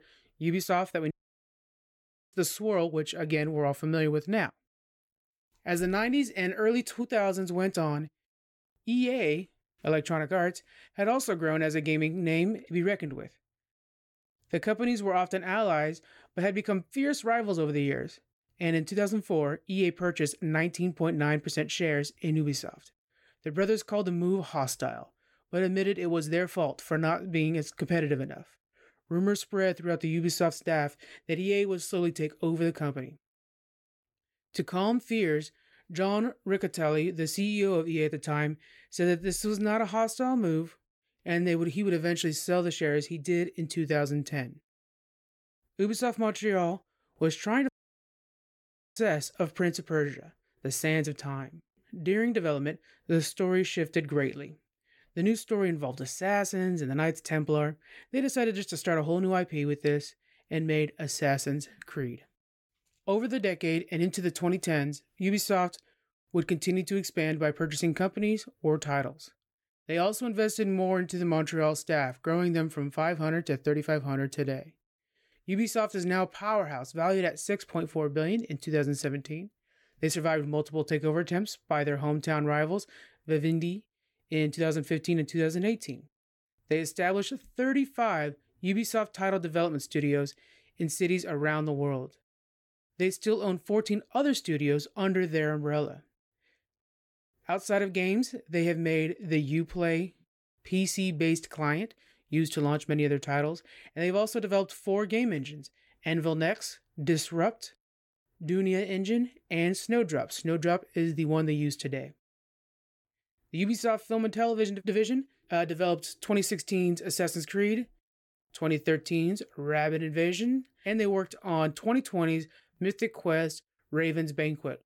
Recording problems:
audio cutting out; at 1 s for 1 s and at 48 s for 1.5 s

